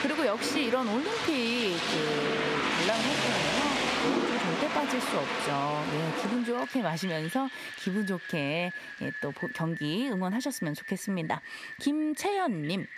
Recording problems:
squashed, flat; somewhat
rain or running water; loud; throughout; as loud as the speech

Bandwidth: 14.5 kHz